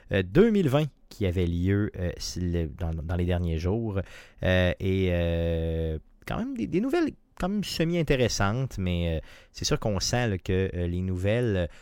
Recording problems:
none

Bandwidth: 16.5 kHz